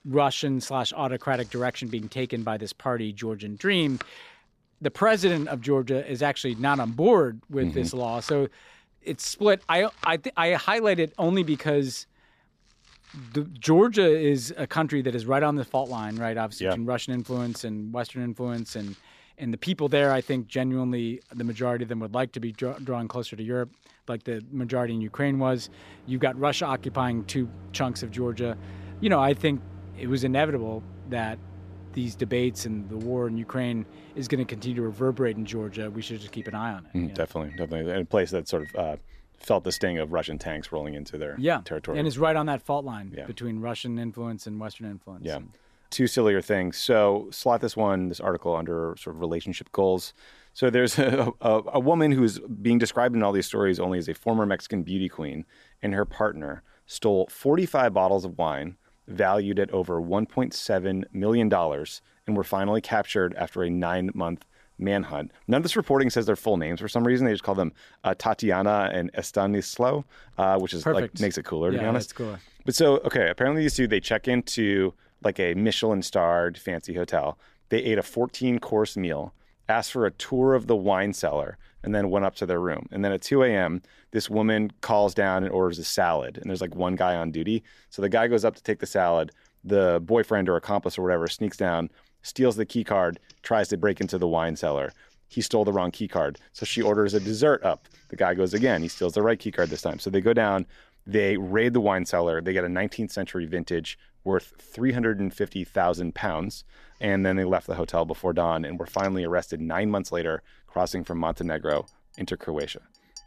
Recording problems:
household noises; faint; throughout; 20 dB below the speech

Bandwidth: 14.5 kHz